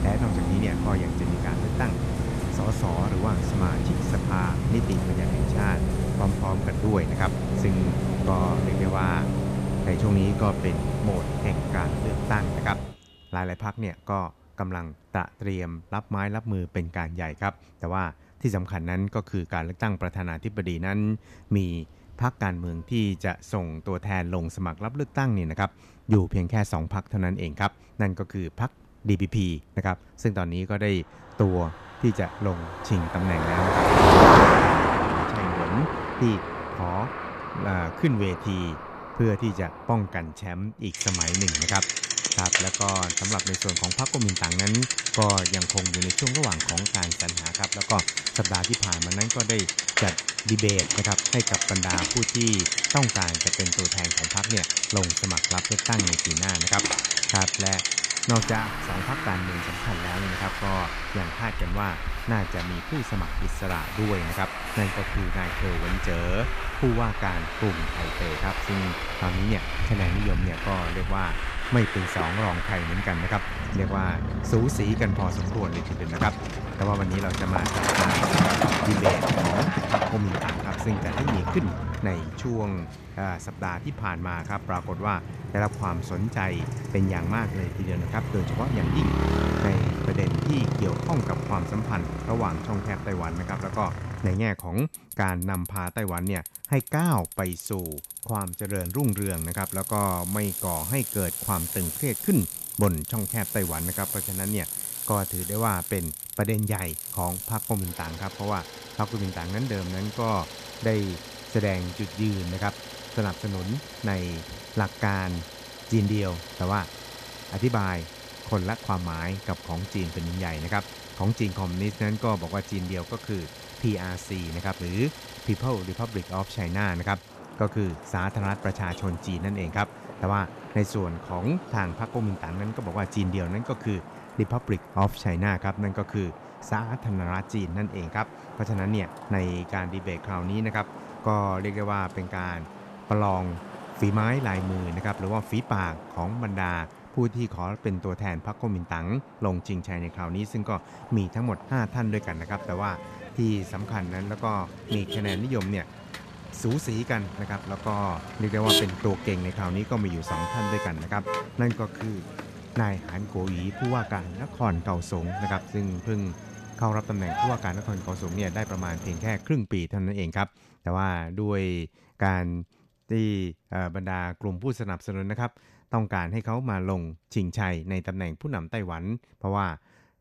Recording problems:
traffic noise; very loud; throughout; 2 dB above the speech

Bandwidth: 14.5 kHz